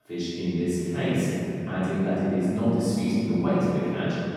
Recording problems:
room echo; strong; dies away in 3 s
off-mic speech; far

